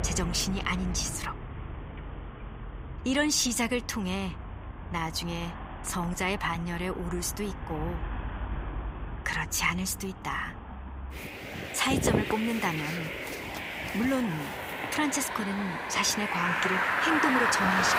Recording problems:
traffic noise; loud; throughout; 3 dB below the speech

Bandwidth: 15.5 kHz